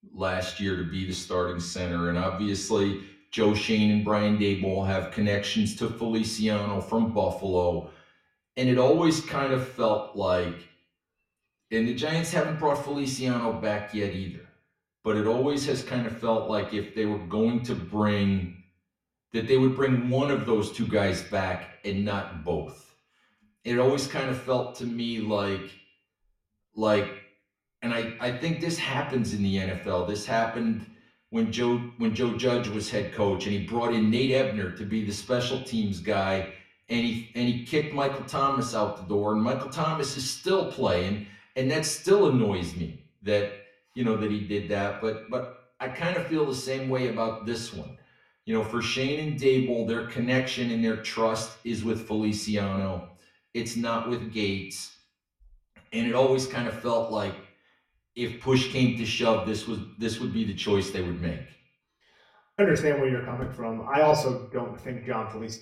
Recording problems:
off-mic speech; far
echo of what is said; noticeable; throughout; 90 ms later, 15 dB below the speech
room echo; very slight; dies away in 0.3 s

